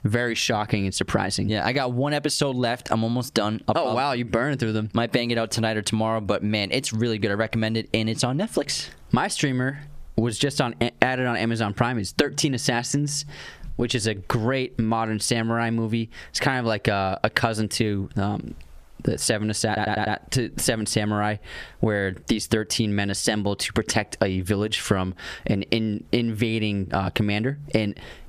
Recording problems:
squashed, flat; somewhat
audio stuttering; at 20 s

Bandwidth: 14.5 kHz